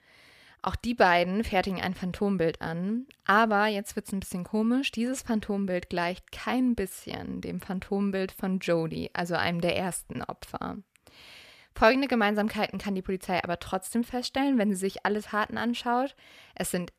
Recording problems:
none

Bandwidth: 14.5 kHz